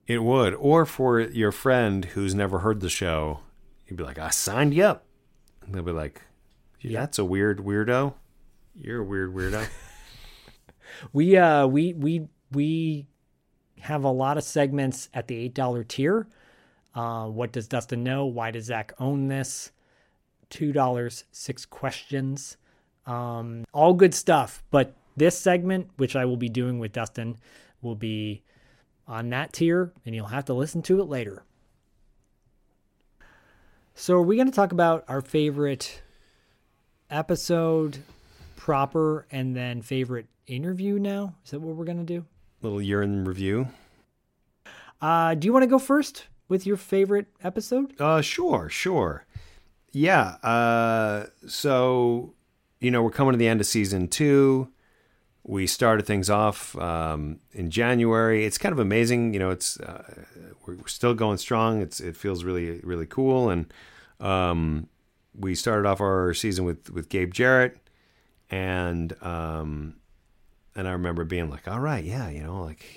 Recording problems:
none

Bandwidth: 16 kHz